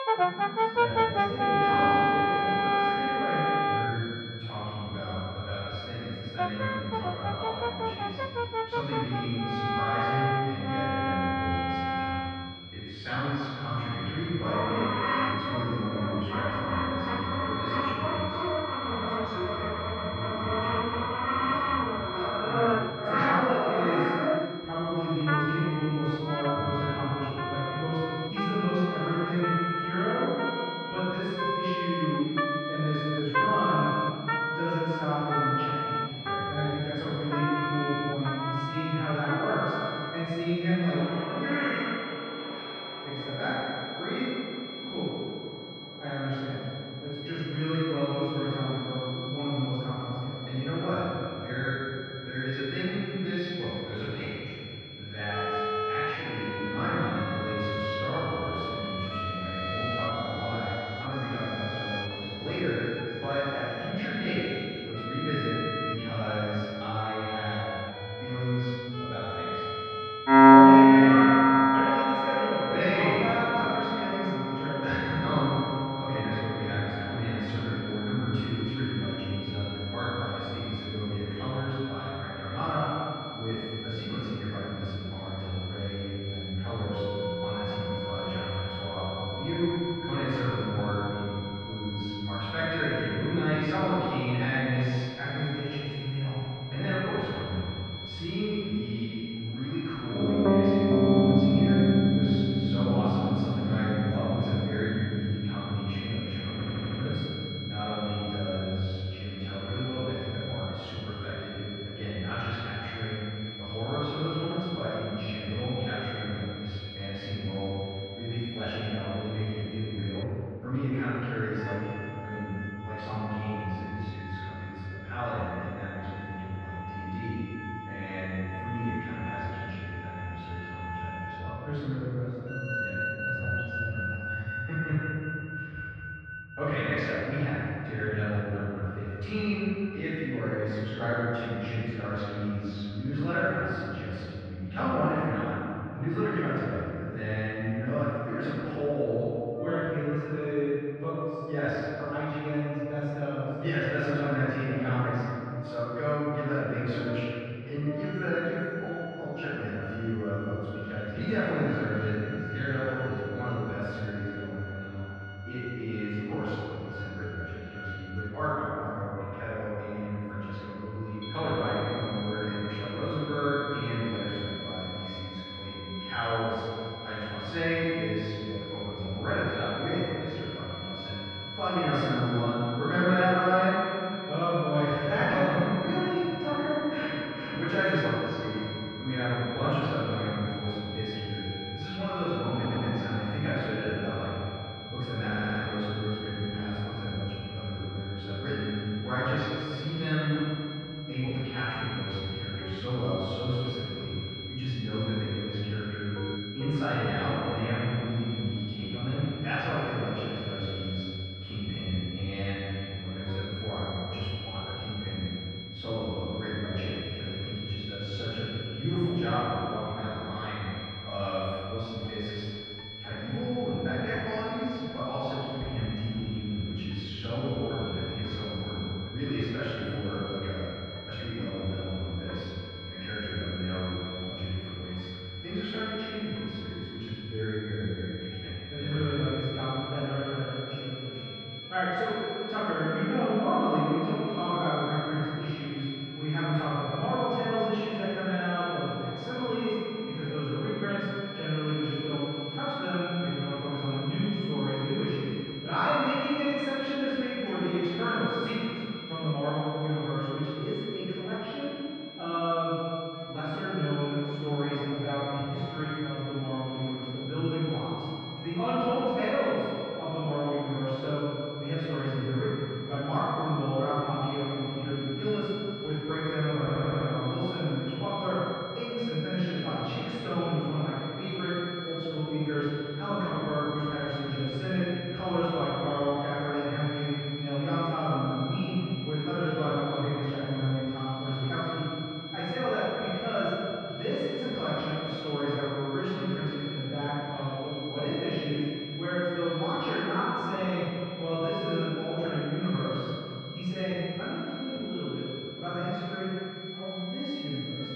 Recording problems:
room echo; strong; dies away in 2.6 s
off-mic speech; far
muffled; very; fading above 2 kHz
background music; very loud; throughout; 2 dB above the speech
high-pitched whine; loud; until 2:00 and from 2:51 on; 3.5 kHz, 9 dB below the speech
audio stuttering; 4 times, first at 1:47

